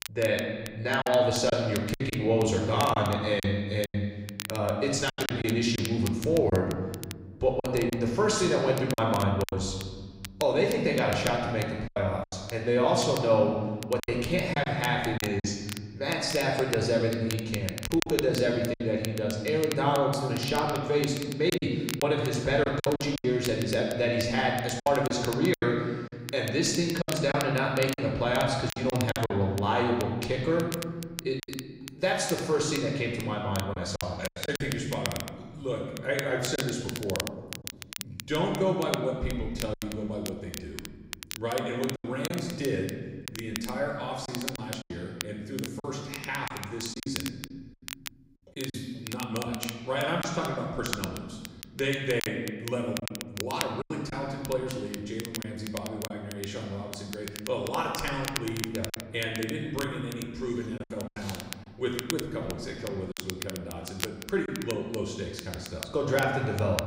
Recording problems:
room echo; noticeable; dies away in 1.4 s
off-mic speech; somewhat distant
crackle, like an old record; noticeable; 10 dB below the speech
choppy; very; 6% of the speech affected

